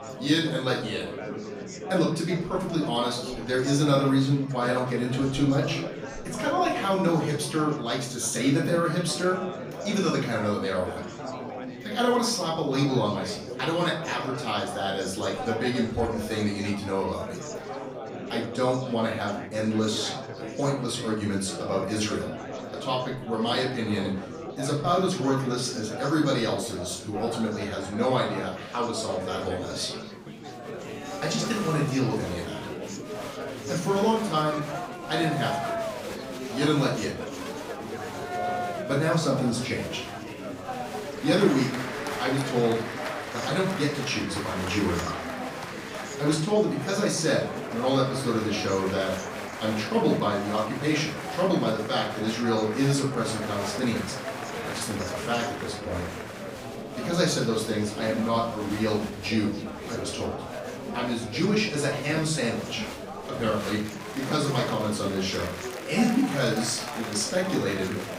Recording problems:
off-mic speech; far
room echo; slight; dies away in 0.5 s
chatter from many people; loud; throughout; 8 dB below the speech
background music; faint; throughout; 30 dB below the speech

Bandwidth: 15.5 kHz